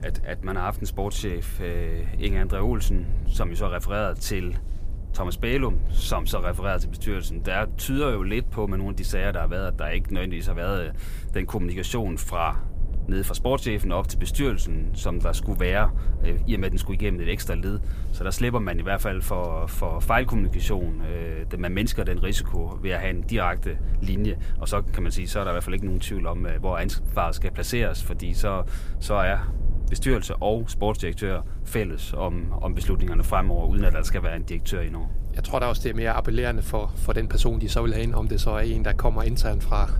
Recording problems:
low rumble; noticeable; throughout; 20 dB below the speech

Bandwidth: 15 kHz